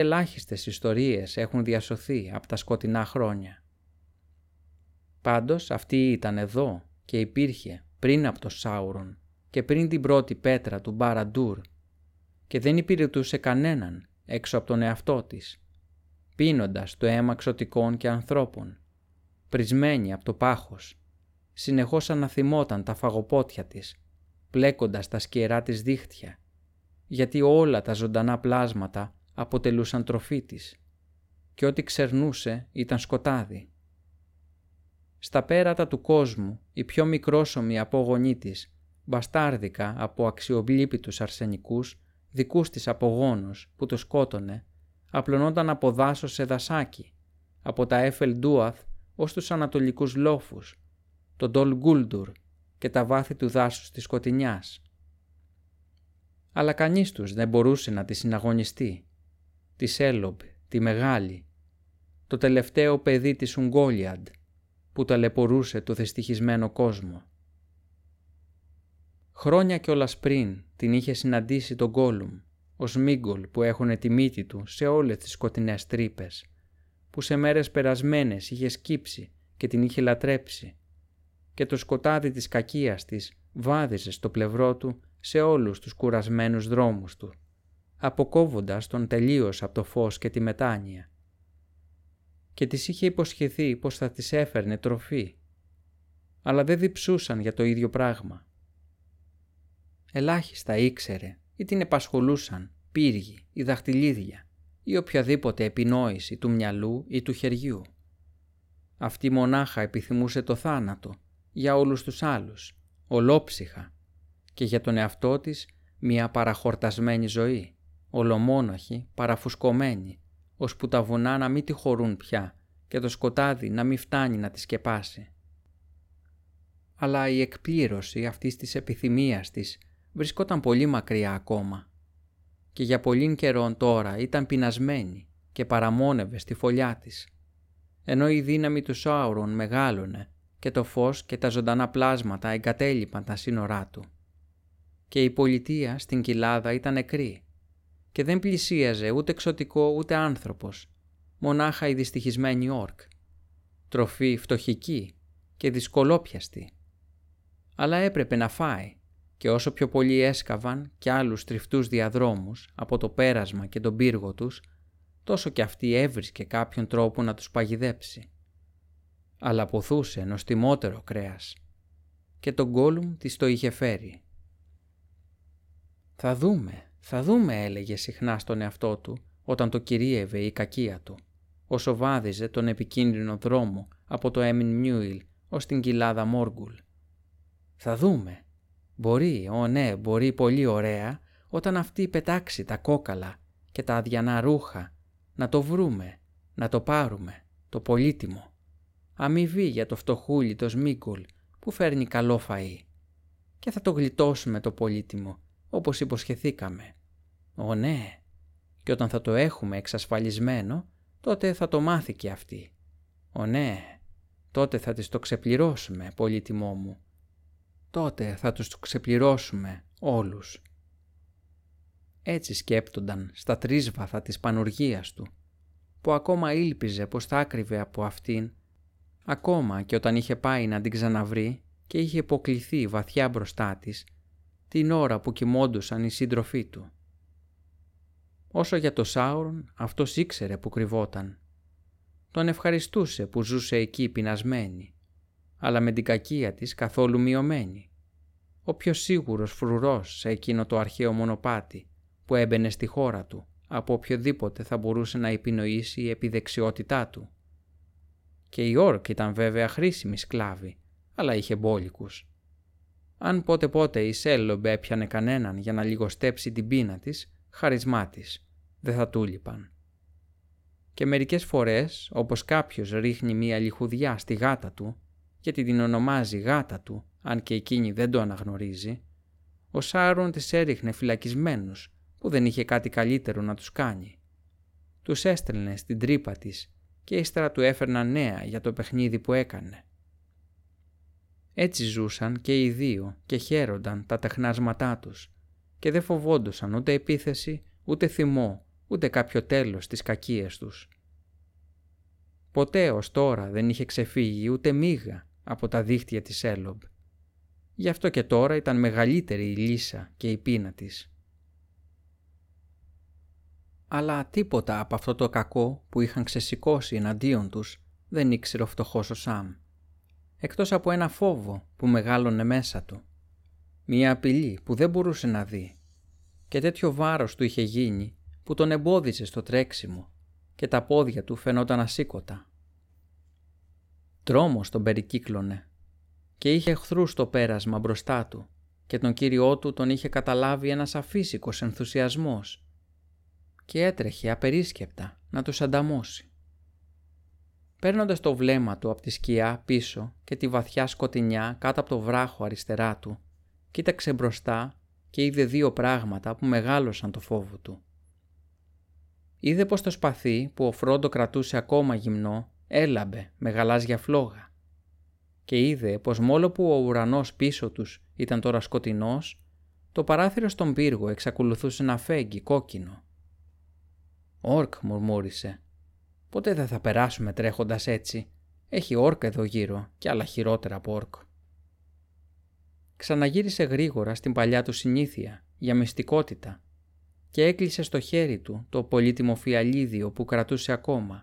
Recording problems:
abrupt cut into speech; at the start

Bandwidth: 16.5 kHz